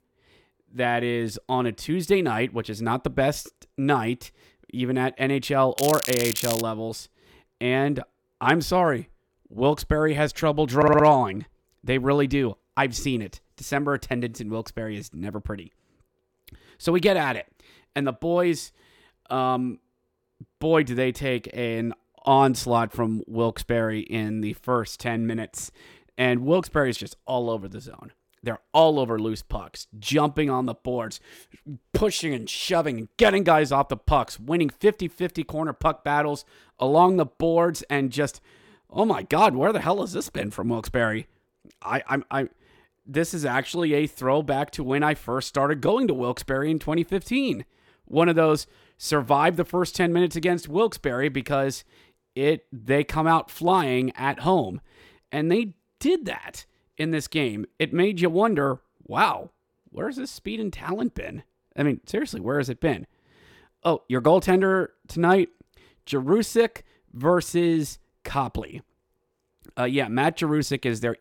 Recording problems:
crackling; loud; at 6 s; 5 dB below the speech
audio stuttering; at 11 s

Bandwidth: 17 kHz